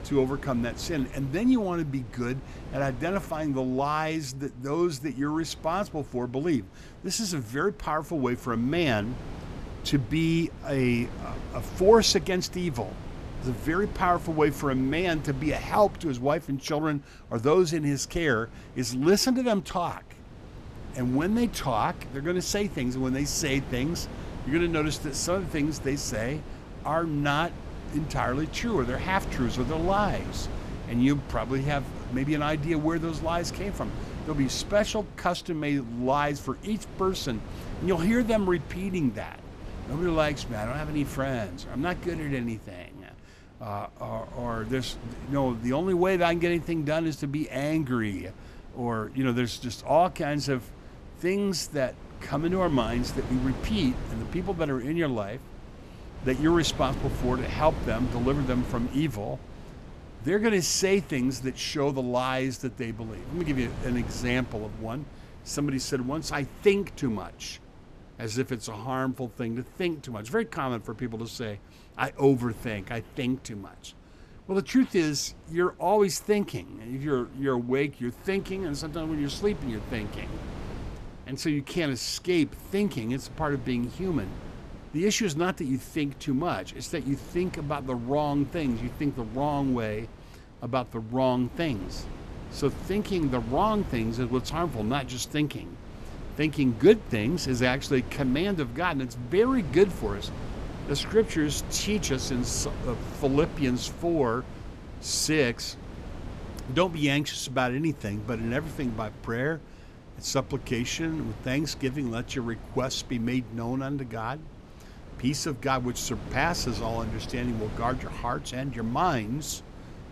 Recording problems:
wind noise on the microphone; occasional gusts; 15 dB below the speech

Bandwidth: 14.5 kHz